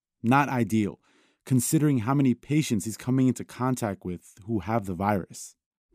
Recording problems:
none

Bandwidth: 15 kHz